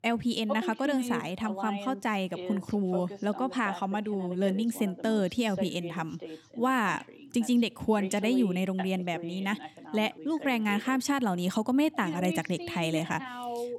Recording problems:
voice in the background; noticeable; throughout; 10 dB below the speech

